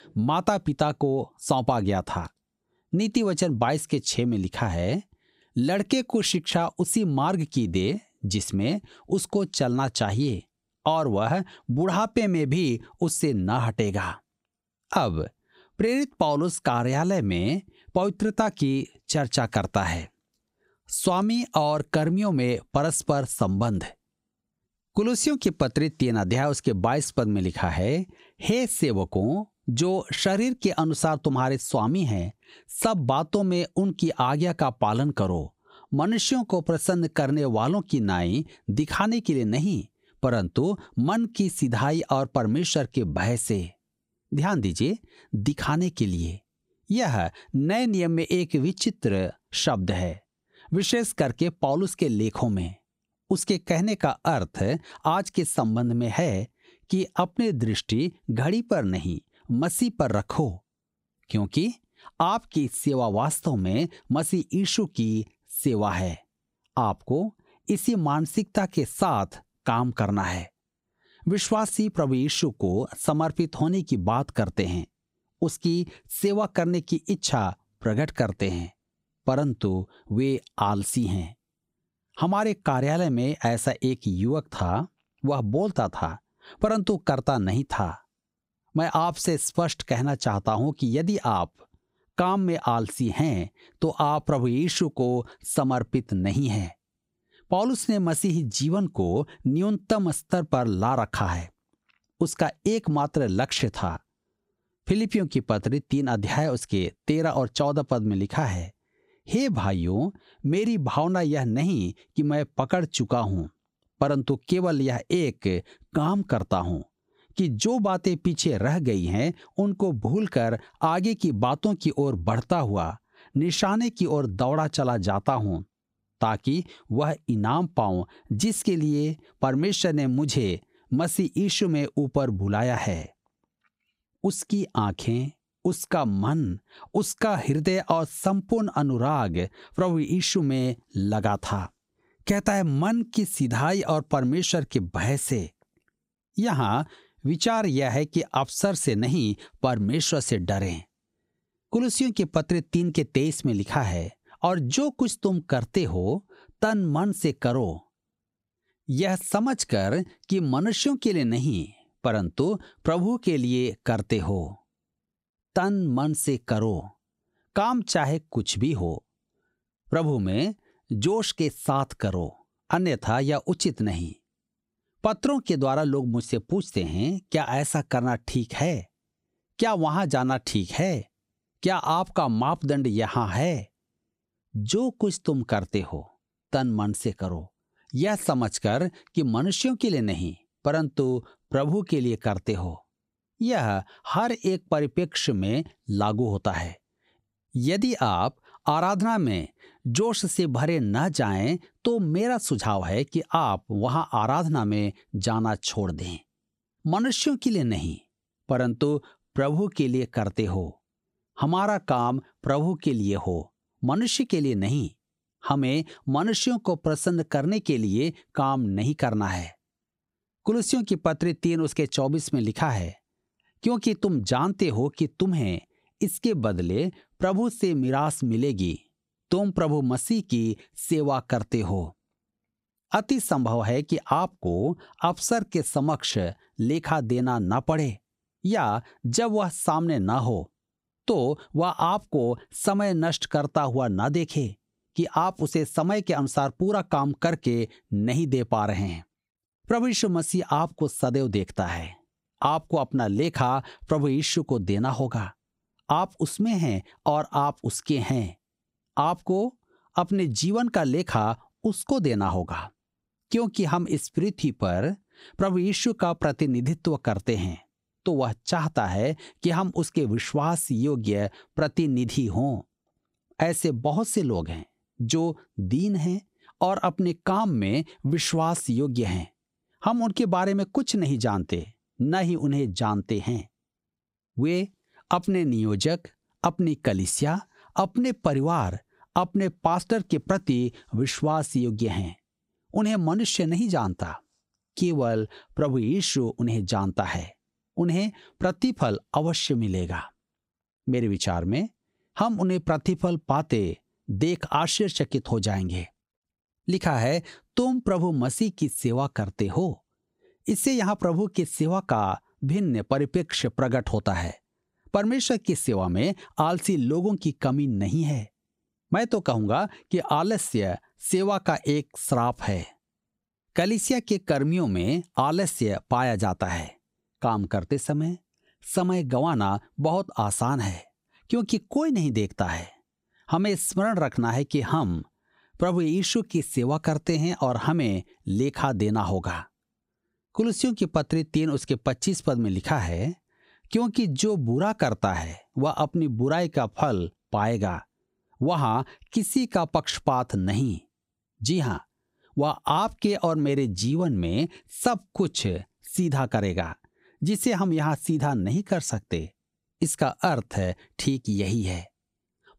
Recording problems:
squashed, flat; somewhat

